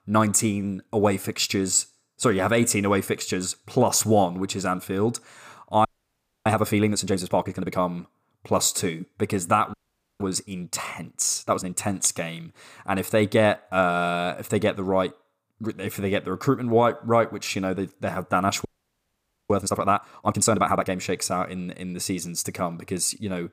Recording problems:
audio freezing; at 6 s for 0.5 s, at 9.5 s and at 19 s for 1 s

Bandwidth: 15 kHz